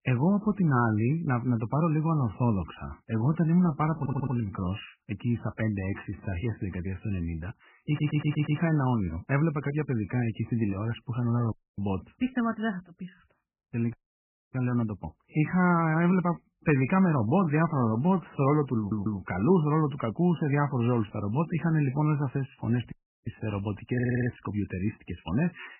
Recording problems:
garbled, watery; badly; nothing above 3 kHz
audio stuttering; 4 times, first at 4 s
audio cutting out; at 12 s, at 14 s for 0.5 s and at 23 s

